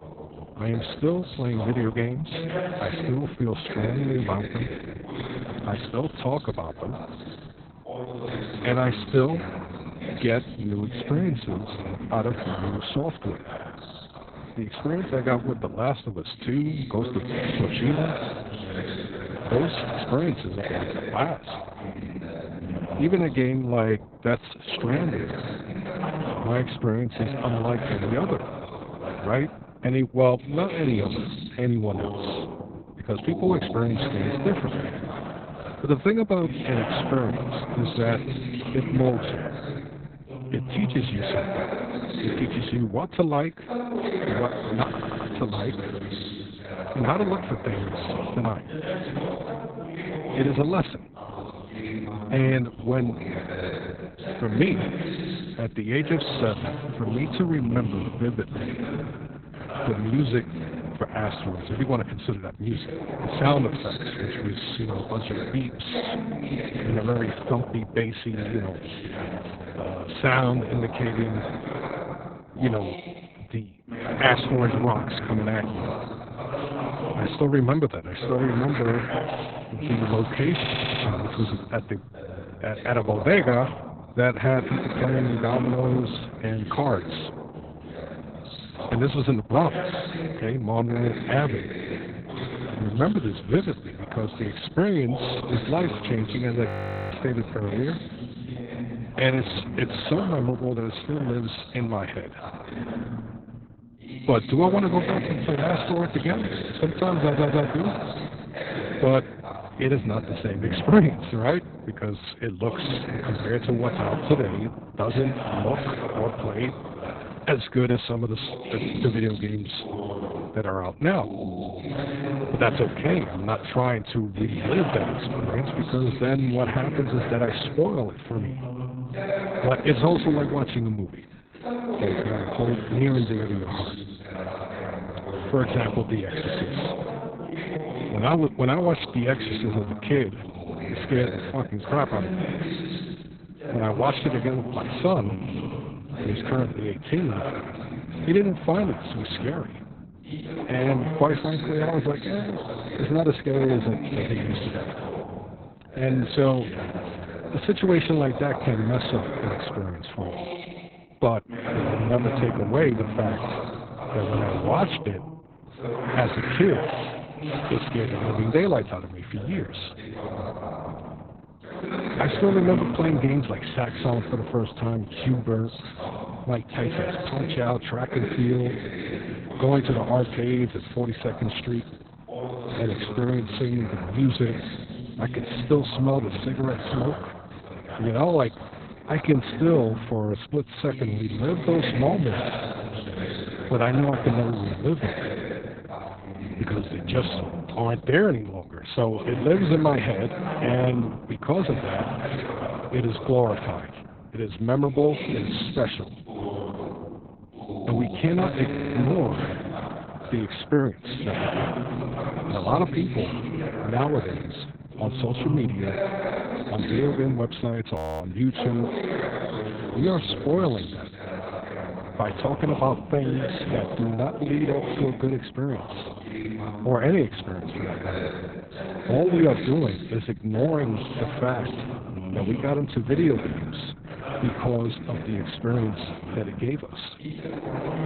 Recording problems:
garbled, watery; badly; nothing above 4 kHz
voice in the background; loud; throughout; 7 dB below the speech
audio stuttering; 4 times, first at 45 s
audio freezing; at 1:37 and at 3:38

